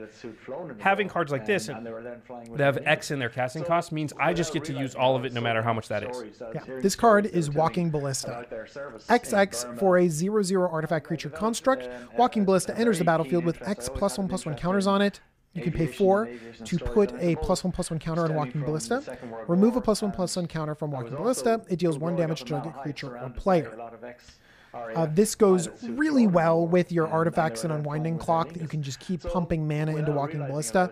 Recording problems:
voice in the background; noticeable; throughout; 15 dB below the speech

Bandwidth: 14.5 kHz